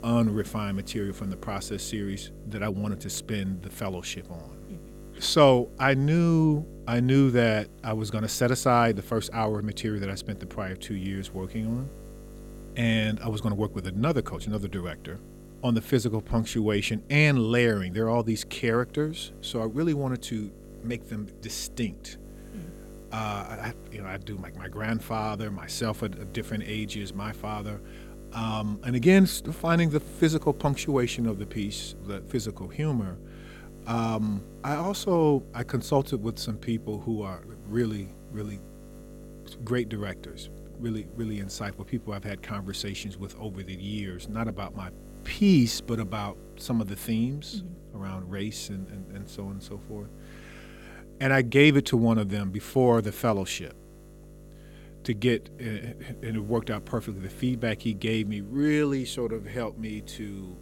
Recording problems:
electrical hum; faint; throughout; 50 Hz, 20 dB below the speech

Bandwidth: 16.5 kHz